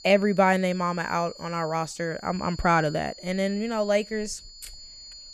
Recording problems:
high-pitched whine; noticeable; throughout; 4.5 kHz, 15 dB below the speech

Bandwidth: 14 kHz